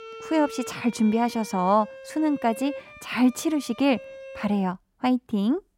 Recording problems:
background music; noticeable; throughout; 15 dB below the speech

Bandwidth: 16 kHz